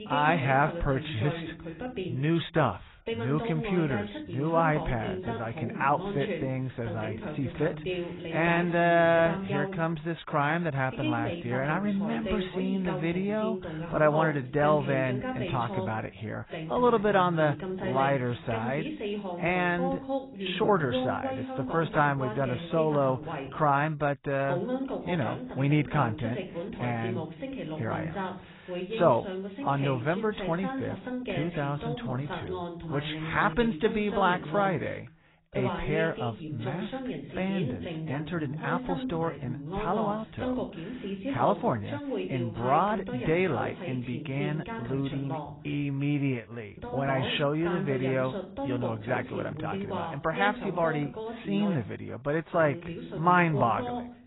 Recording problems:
garbled, watery; badly; nothing above 4 kHz
voice in the background; loud; throughout; 7 dB below the speech

